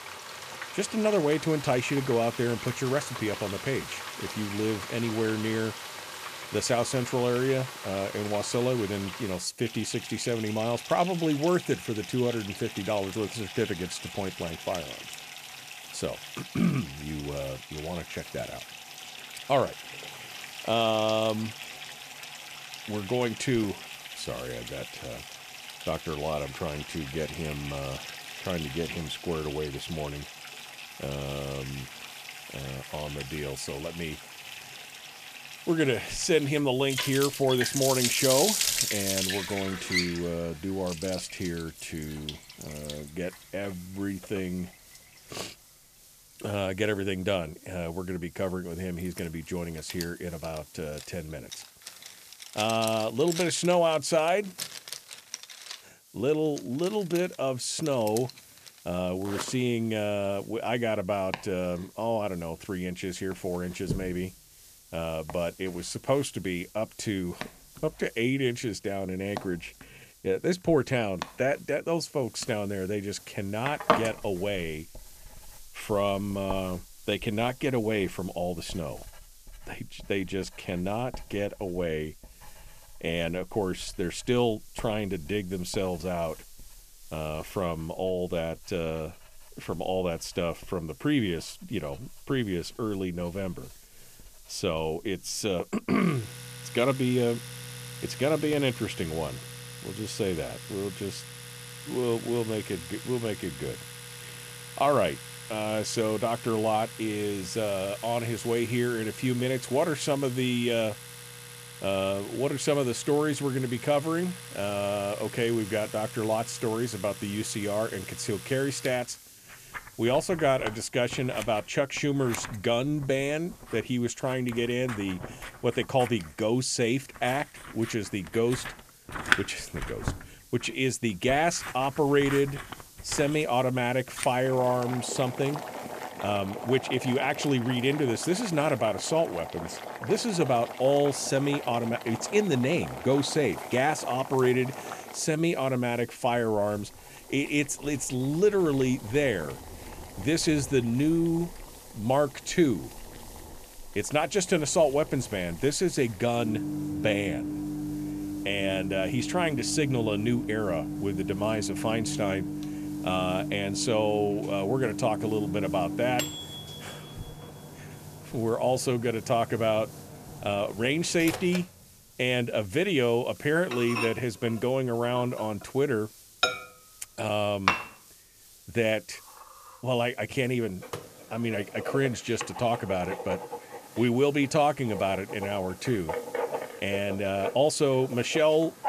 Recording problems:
household noises; loud; throughout; 8 dB below the speech
hiss; faint; throughout; 25 dB below the speech

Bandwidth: 14.5 kHz